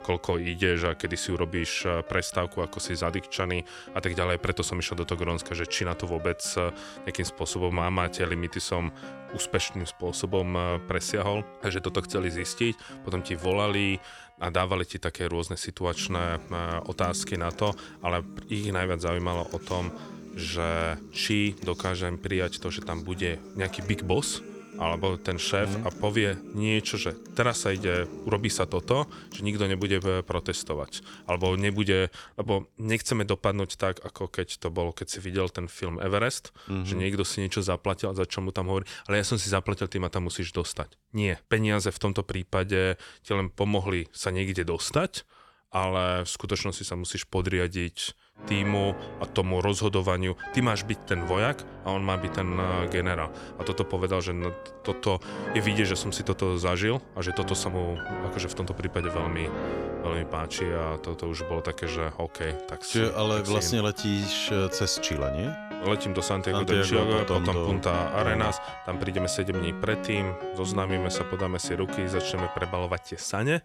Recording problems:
background music; loud; throughout; 10 dB below the speech

